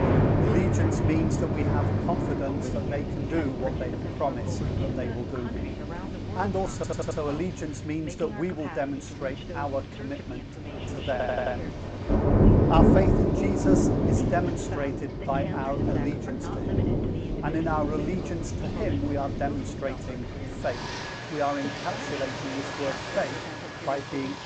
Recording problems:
high frequencies cut off; noticeable; nothing above 8 kHz
rain or running water; very loud; throughout; 4 dB above the speech
voice in the background; noticeable; throughout; 10 dB below the speech
audio stuttering; at 6.5 s and at 11 s

